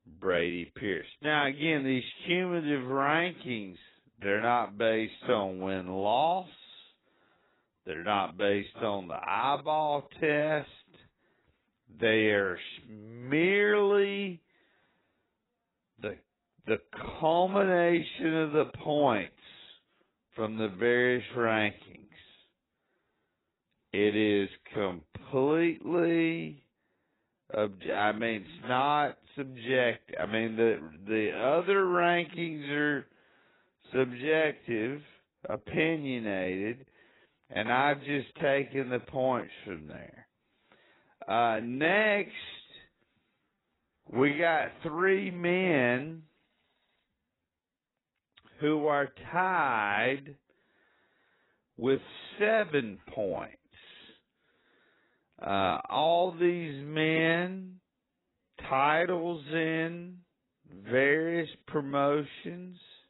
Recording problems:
garbled, watery; badly; nothing above 4 kHz
wrong speed, natural pitch; too slow; 0.6 times normal speed

